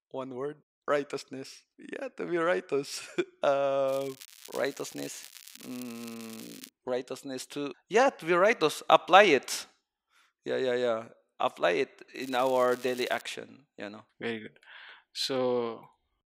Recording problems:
thin; very slightly; fading below 950 Hz
crackling; noticeable; from 4 to 6.5 s and at 12 s; 20 dB below the speech

